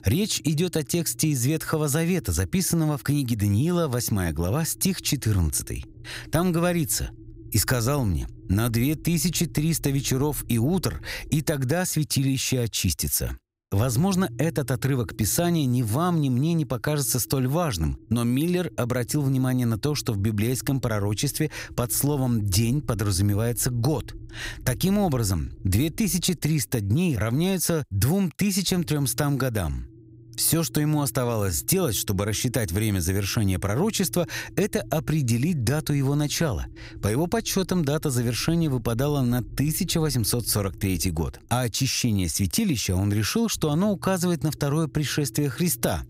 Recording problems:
low rumble; faint; throughout; 25 dB below the speech

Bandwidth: 15.5 kHz